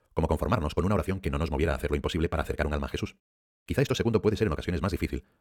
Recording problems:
wrong speed, natural pitch; too fast; 1.7 times normal speed

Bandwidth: 18 kHz